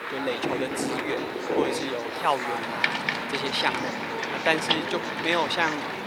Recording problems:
thin; somewhat; fading below 350 Hz
rain or running water; loud; throughout; 1 dB below the speech
chatter from many people; loud; throughout; 4 dB below the speech
household noises; noticeable; throughout; 20 dB below the speech
hiss; faint; throughout; 30 dB below the speech

